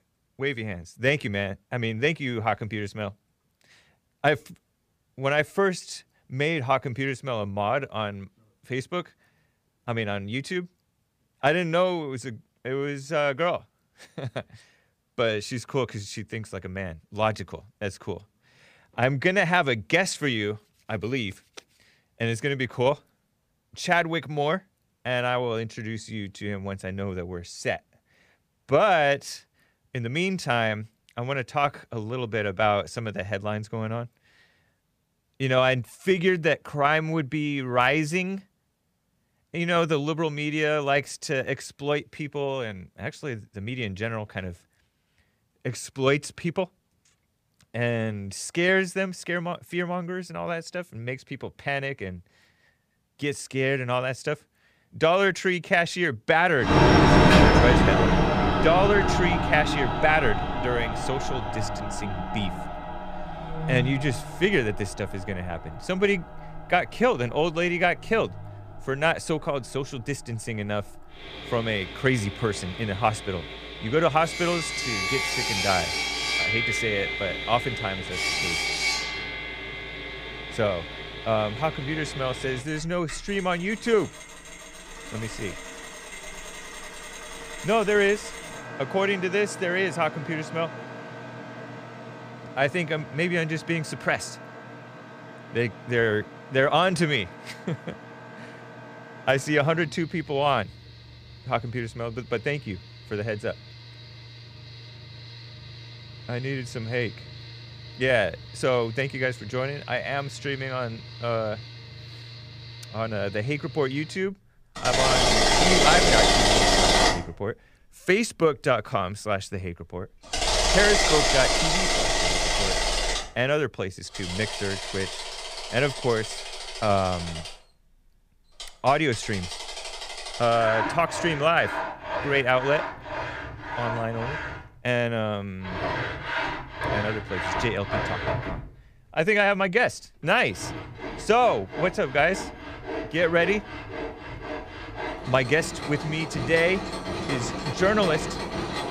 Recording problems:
machinery noise; loud; from 57 s on; as loud as the speech

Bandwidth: 15 kHz